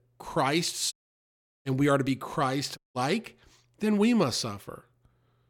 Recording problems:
audio cutting out; at 1 s for 0.5 s and at 3 s

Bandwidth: 17 kHz